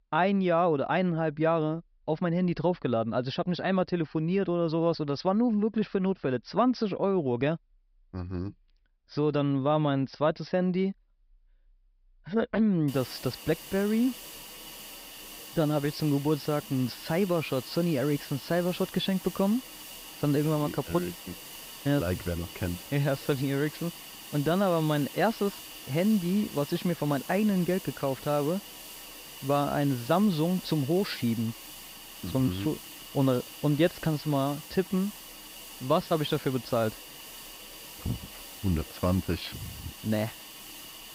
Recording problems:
high frequencies cut off; noticeable; nothing above 5.5 kHz
hiss; noticeable; from 13 s on; 15 dB below the speech

